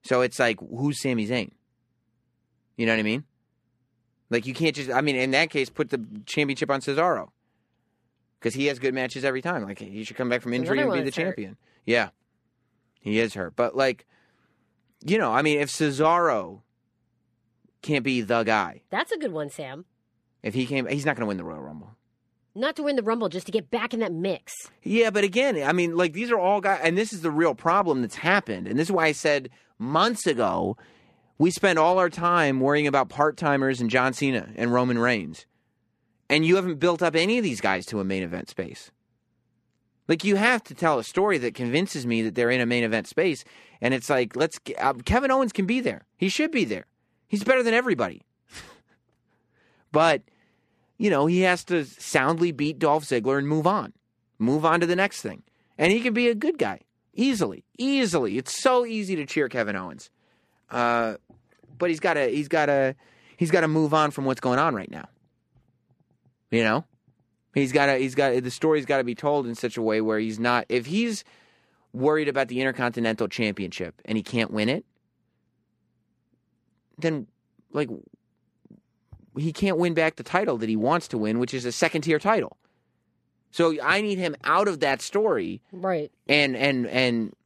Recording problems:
none

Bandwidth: 14 kHz